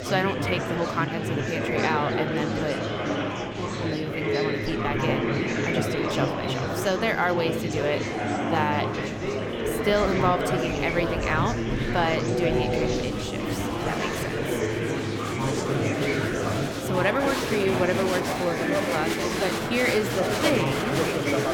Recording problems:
murmuring crowd; very loud; throughout; 2 dB above the speech

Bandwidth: 18 kHz